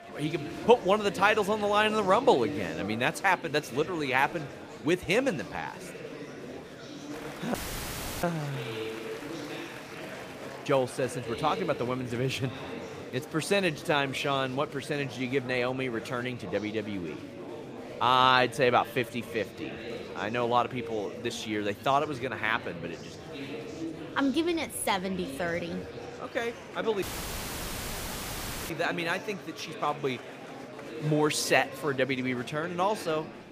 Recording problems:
murmuring crowd; noticeable; throughout; 10 dB below the speech
audio cutting out; filled with static; at 7.5 s for 0.5 s and at 27 s for 1.5 s

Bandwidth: 15 kHz